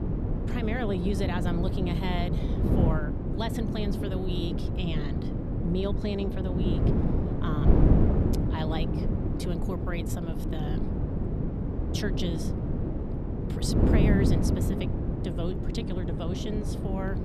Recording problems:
wind noise on the microphone; heavy; 1 dB above the speech

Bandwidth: 13.5 kHz